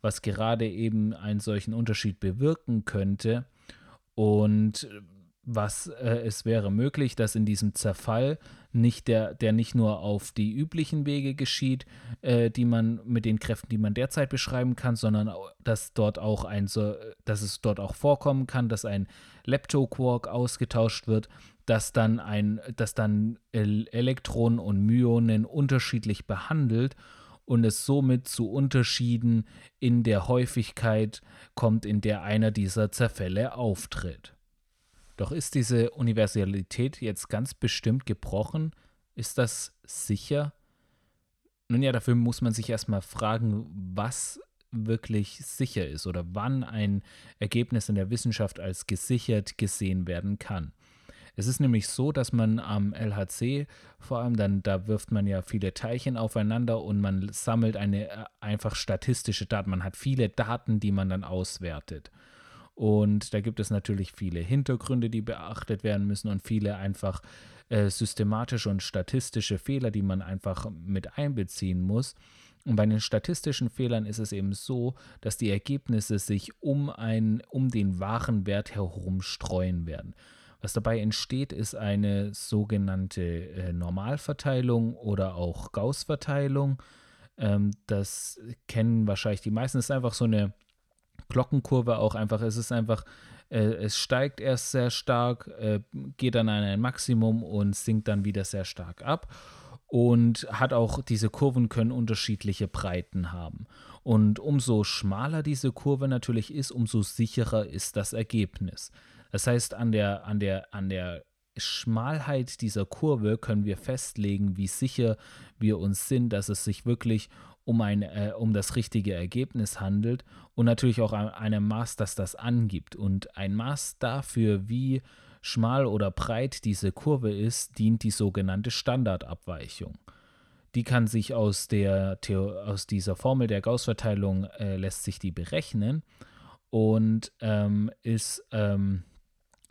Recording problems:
none

